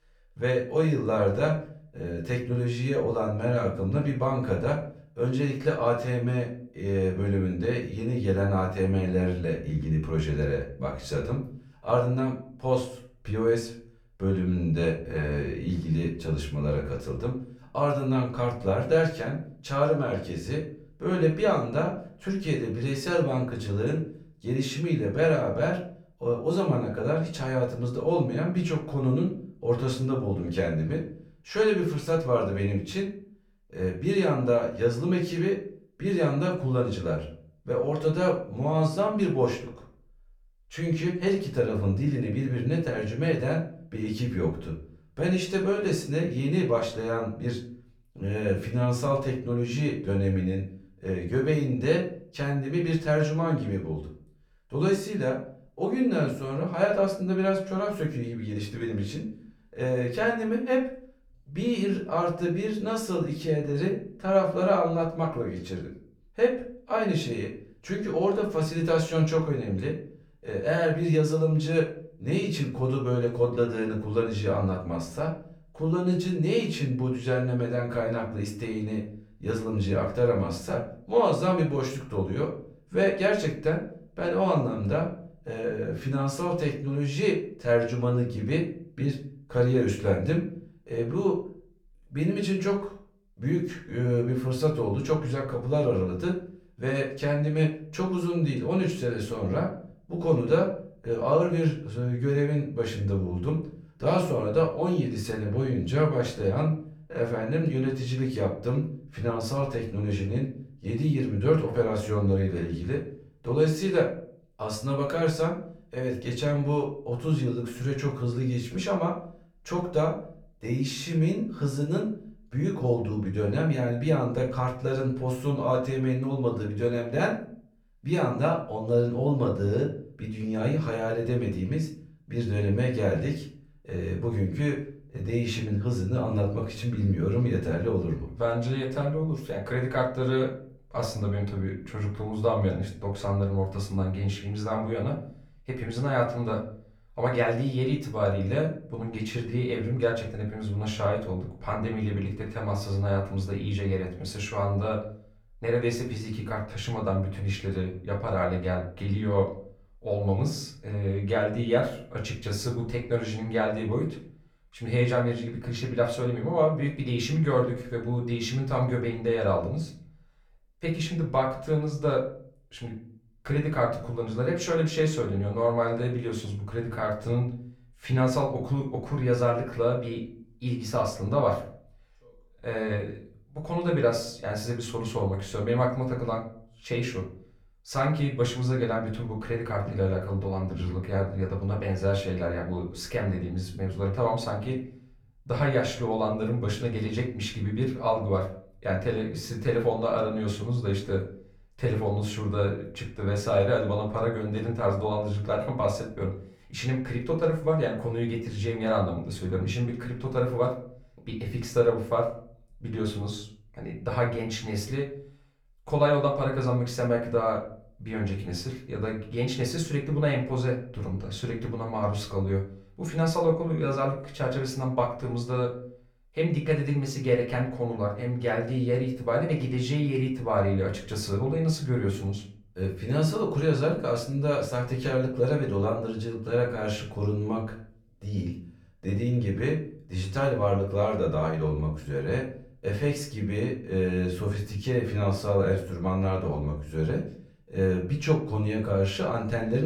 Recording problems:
off-mic speech; far
room echo; slight; dies away in 0.4 s
abrupt cut into speech; at the end

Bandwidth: 18.5 kHz